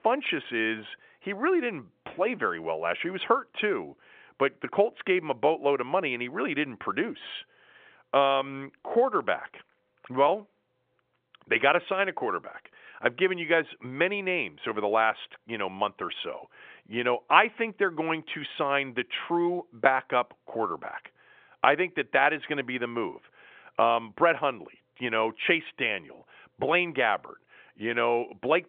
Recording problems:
phone-call audio; nothing above 3.5 kHz

